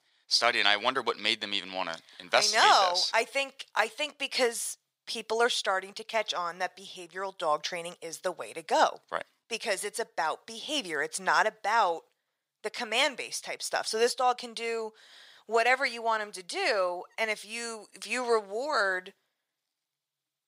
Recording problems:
thin; very; fading below 750 Hz

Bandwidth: 15.5 kHz